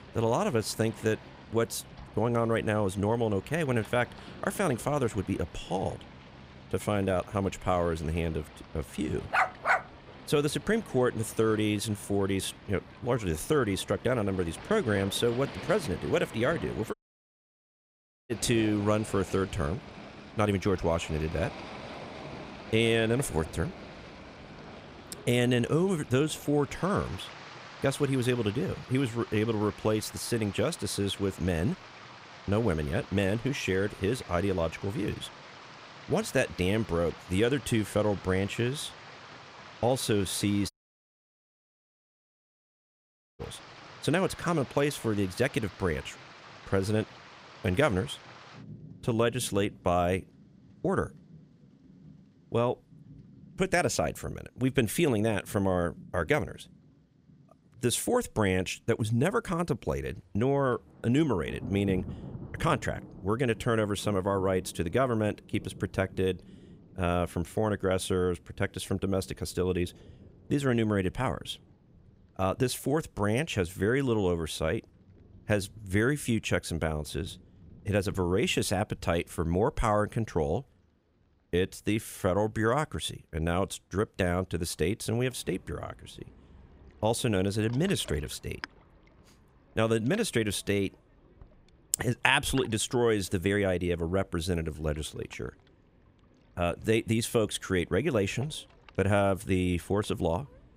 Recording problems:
rain or running water; noticeable; throughout; 20 dB below the speech
dog barking; loud; at 9.5 s; peak 4 dB above the speech
audio cutting out; at 17 s for 1.5 s and at 41 s for 2.5 s

